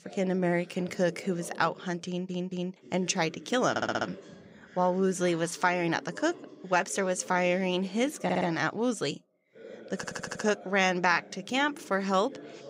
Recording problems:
voice in the background; noticeable; throughout; 20 dB below the speech
audio stuttering; 4 times, first at 2 s

